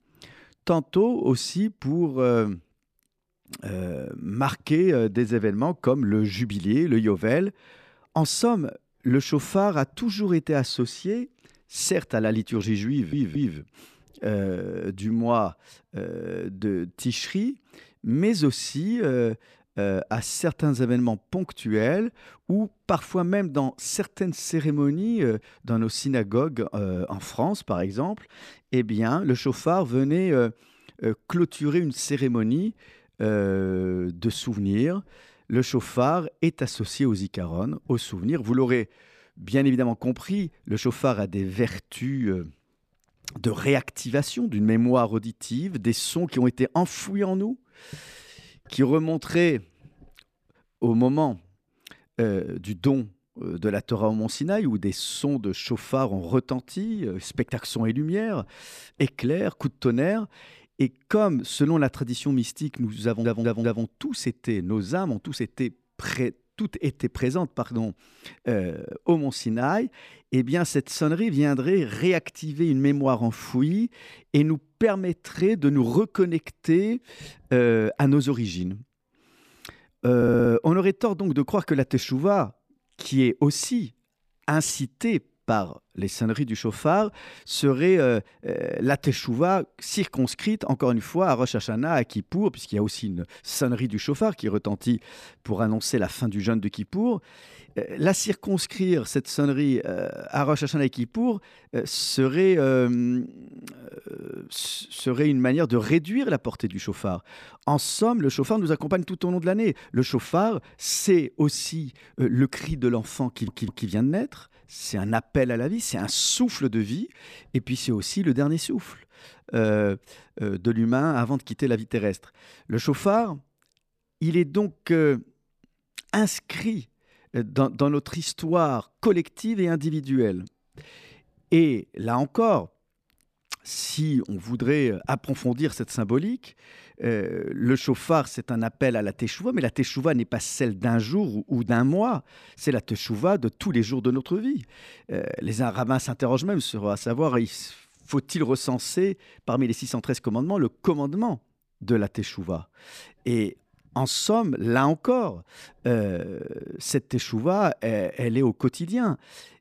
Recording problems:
audio stuttering; 4 times, first at 13 s

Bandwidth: 14.5 kHz